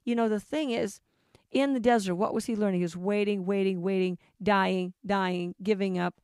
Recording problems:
none

